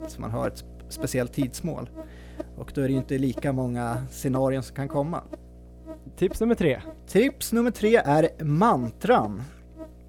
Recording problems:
electrical hum; noticeable; throughout; 60 Hz, 20 dB below the speech

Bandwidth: 18.5 kHz